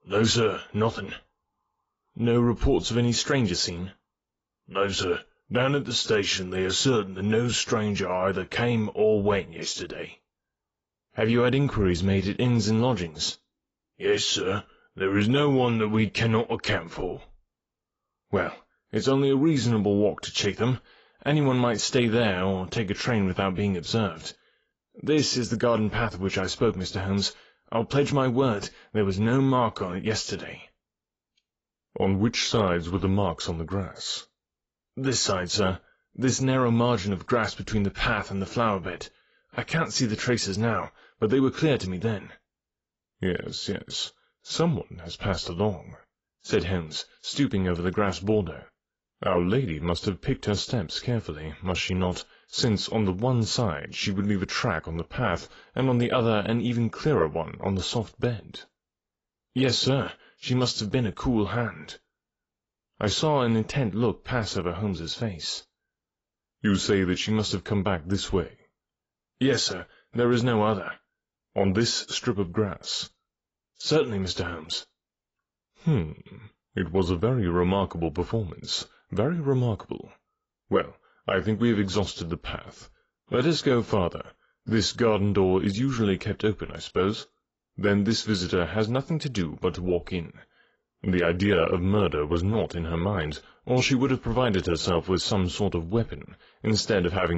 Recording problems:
garbled, watery; badly; nothing above 7.5 kHz
abrupt cut into speech; at the end

